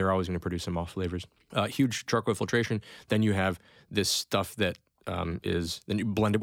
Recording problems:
abrupt cut into speech; at the start and the end

